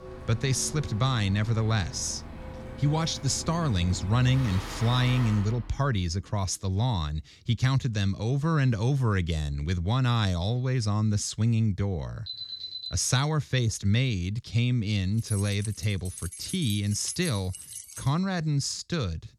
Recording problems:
traffic noise; noticeable; until 5.5 s; 10 dB below the speech
alarm; noticeable; at 12 s; peak 7 dB below the speech
jangling keys; noticeable; from 15 to 18 s; peak 8 dB below the speech

